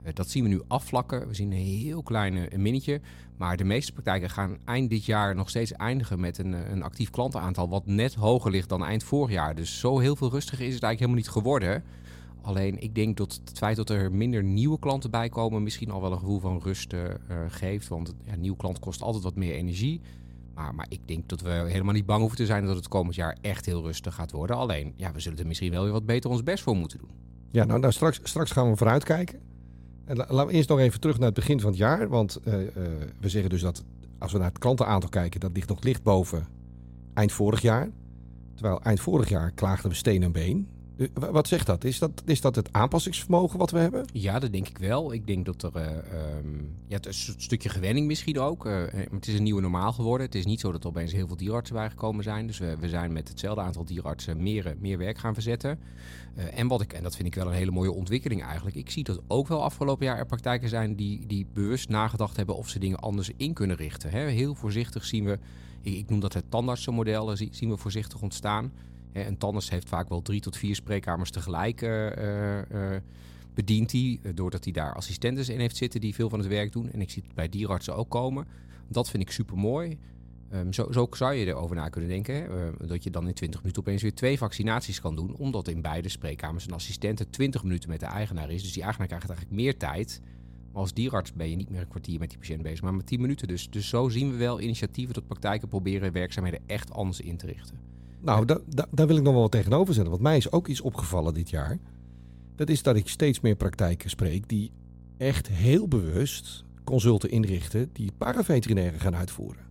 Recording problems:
electrical hum; faint; throughout; 60 Hz, 25 dB below the speech

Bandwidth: 16 kHz